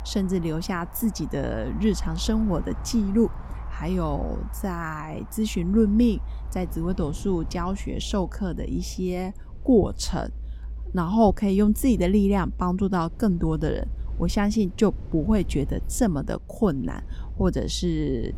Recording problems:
wind in the background; faint; throughout; 25 dB below the speech
low rumble; faint; throughout; 25 dB below the speech

